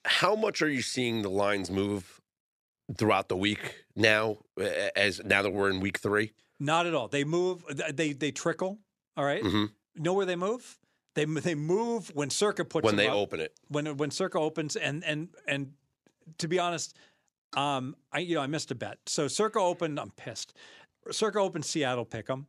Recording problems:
none

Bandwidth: 14 kHz